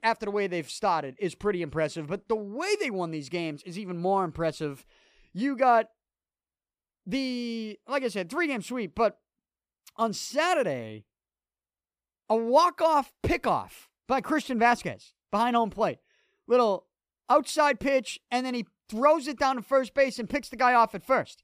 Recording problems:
none

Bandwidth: 15 kHz